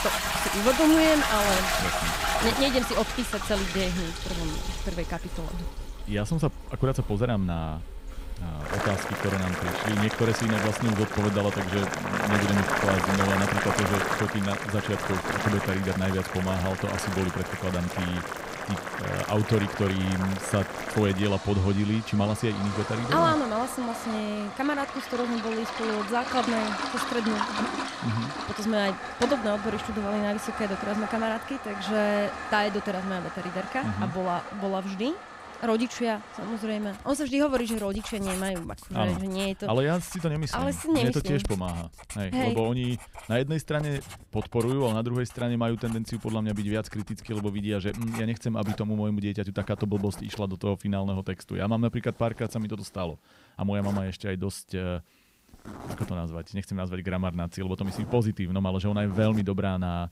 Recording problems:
household noises; loud; throughout; 3 dB below the speech

